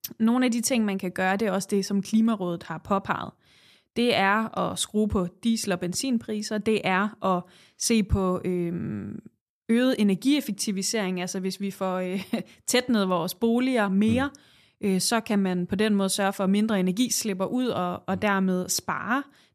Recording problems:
none

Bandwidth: 14.5 kHz